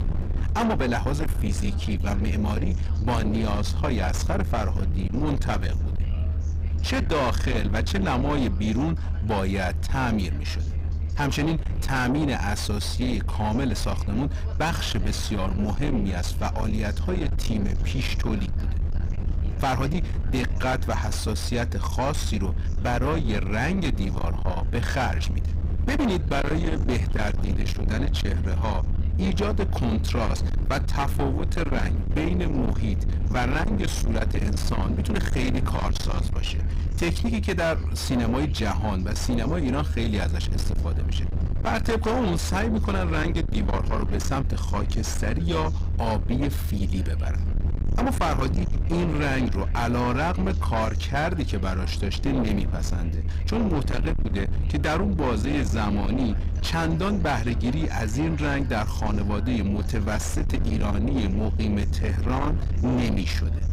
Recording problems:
distortion; heavy; 7 dB below the speech
low rumble; loud; throughout; 9 dB below the speech
background chatter; faint; throughout; 2 voices, 25 dB below the speech

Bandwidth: 15.5 kHz